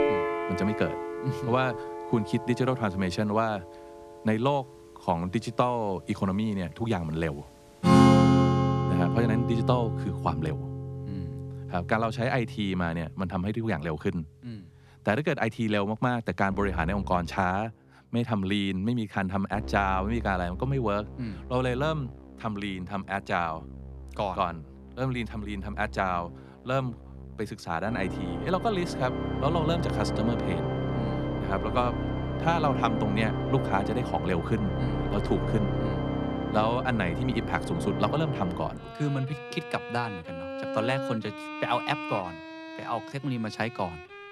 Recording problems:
background music; loud; throughout; 1 dB below the speech

